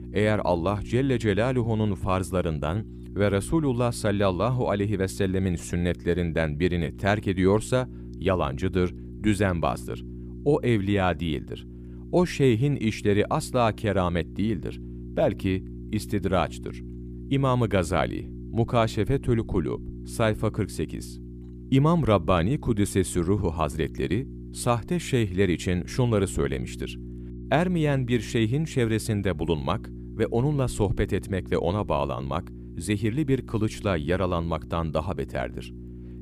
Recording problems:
electrical hum; faint; throughout; 60 Hz, 20 dB below the speech

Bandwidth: 15 kHz